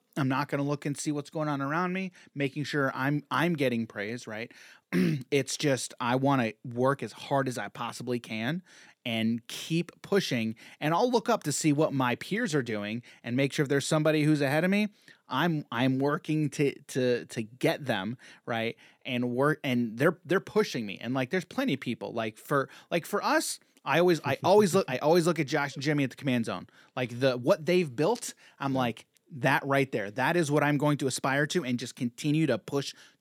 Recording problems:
none

